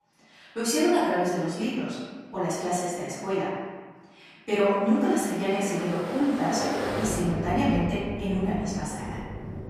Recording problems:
room echo; strong; dies away in 1.4 s
off-mic speech; far
rain or running water; loud; from 5 s on; 7 dB below the speech

